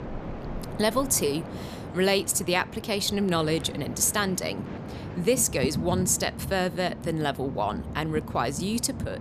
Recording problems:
train or aircraft noise; noticeable; throughout; 10 dB below the speech

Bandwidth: 14.5 kHz